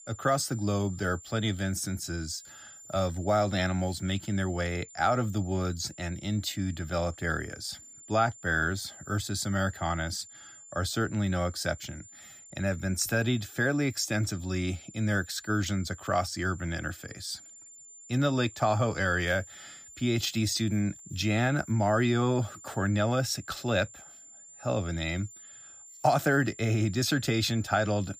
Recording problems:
high-pitched whine; noticeable; throughout; 7 kHz, 20 dB below the speech

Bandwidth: 15 kHz